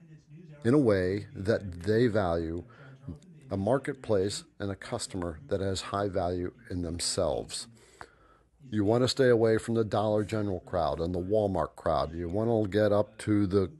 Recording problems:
voice in the background; faint; throughout; 25 dB below the speech

